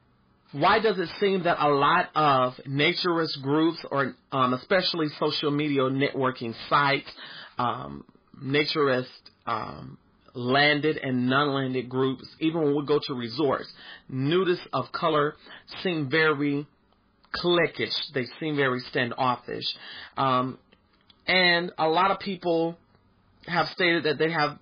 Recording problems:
garbled, watery; badly; nothing above 4 kHz
distortion; slight; 5% of the sound clipped

